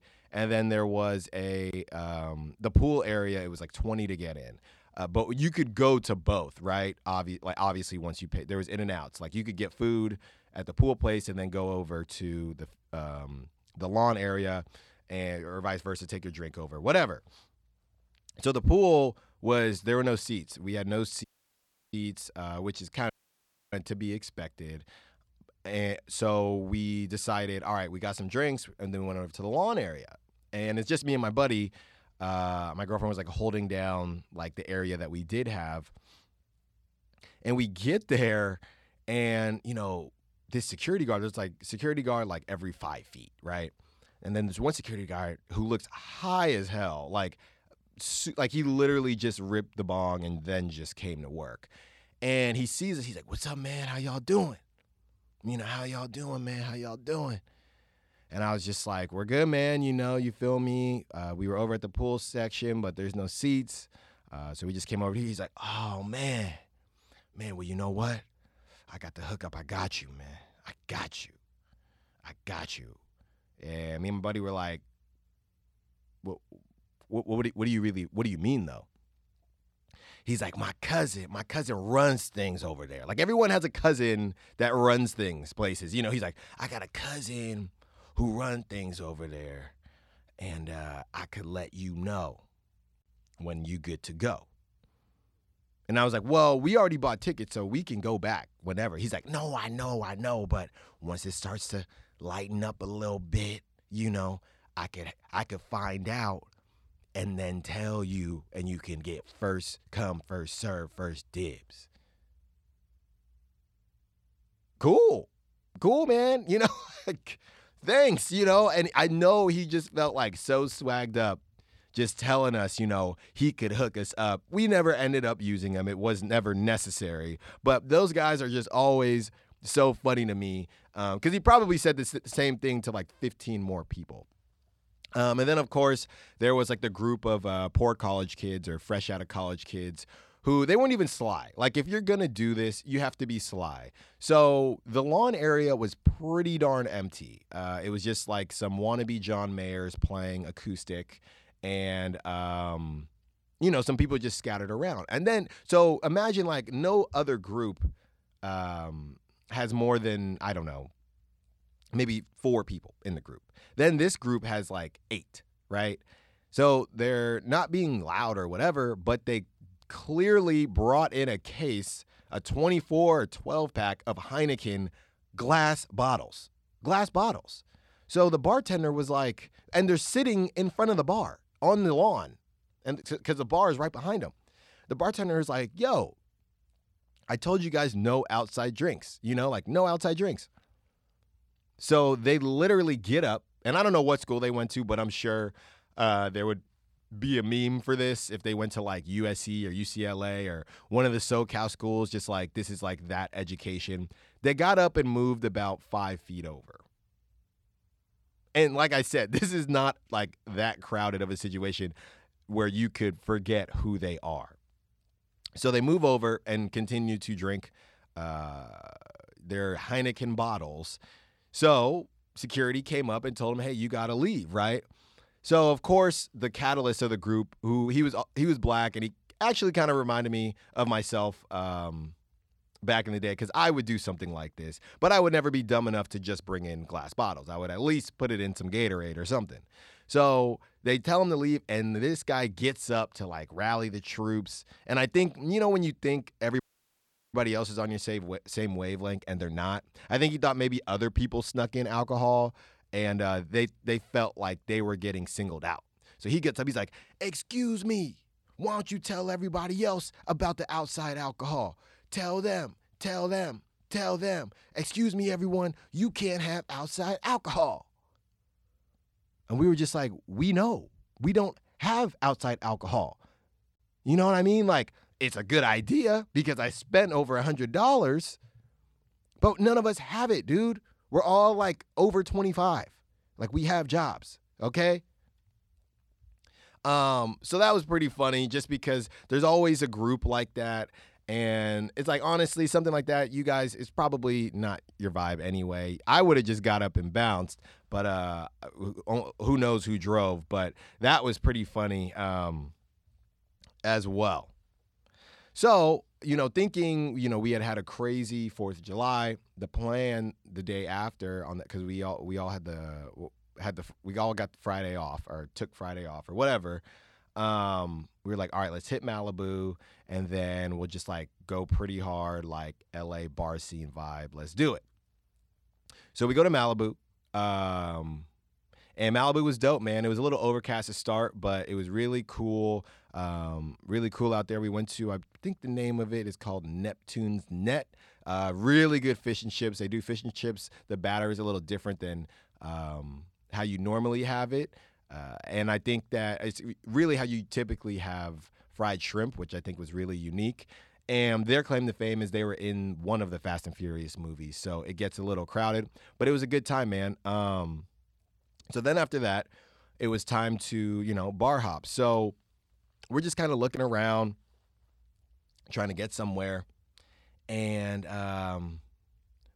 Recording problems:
audio cutting out; at 21 s for 0.5 s, at 23 s for 0.5 s and at 4:07 for 0.5 s

